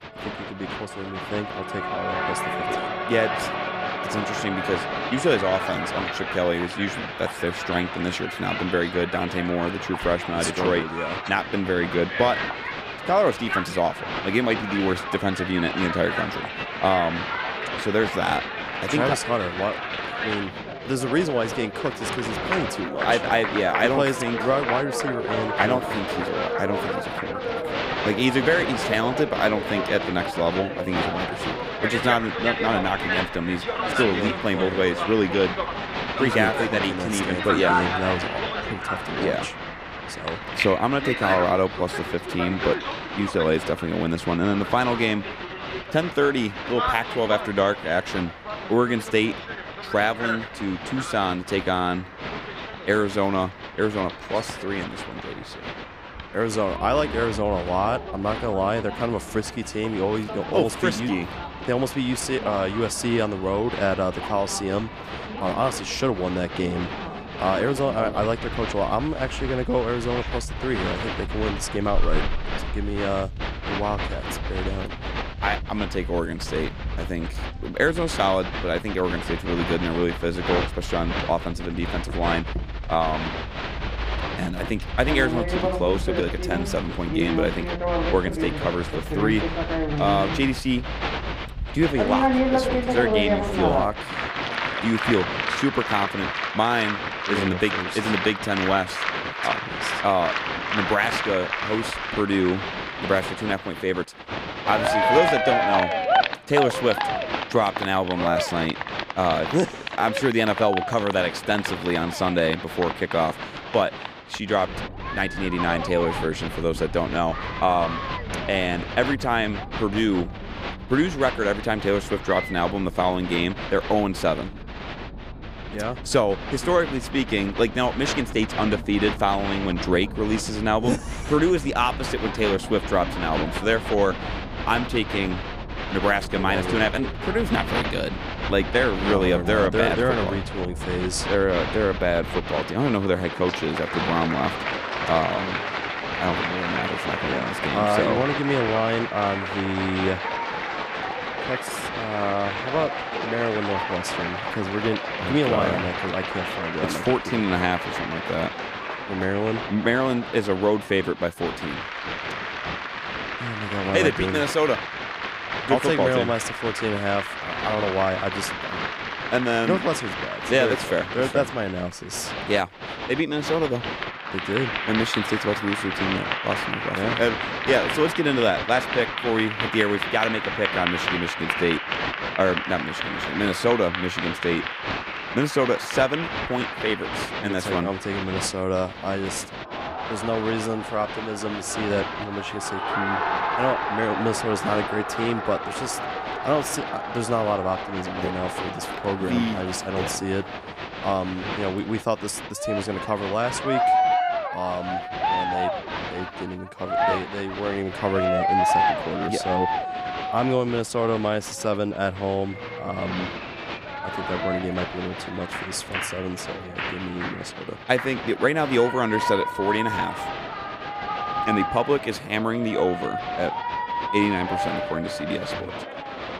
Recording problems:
crowd noise; loud; throughout; 3 dB below the speech

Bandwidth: 15 kHz